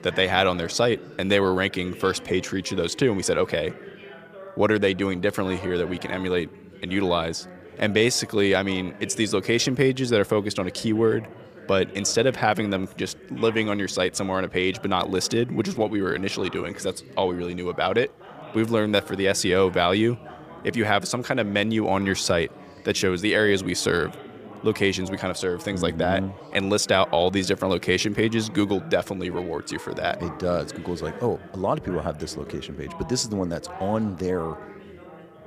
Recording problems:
background chatter; noticeable; throughout; 3 voices, 20 dB below the speech

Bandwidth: 15 kHz